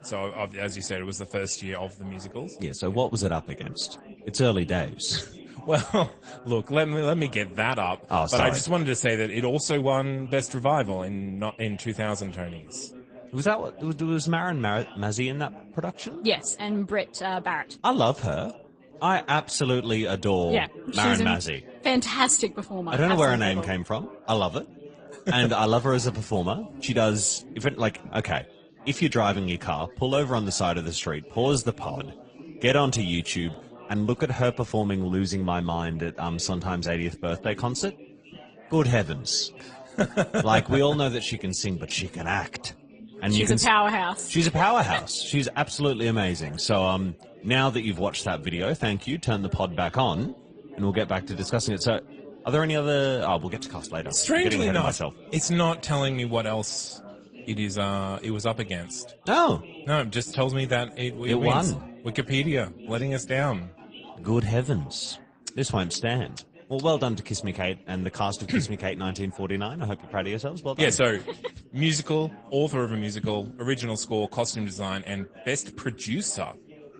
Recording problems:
garbled, watery; slightly; nothing above 8.5 kHz
background chatter; faint; throughout; 4 voices, 20 dB below the speech

